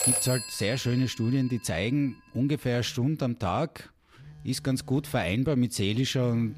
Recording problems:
alarms or sirens; loud; throughout; 6 dB below the speech

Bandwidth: 15 kHz